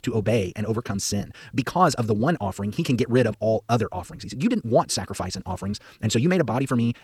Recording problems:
wrong speed, natural pitch; too fast; 1.5 times normal speed

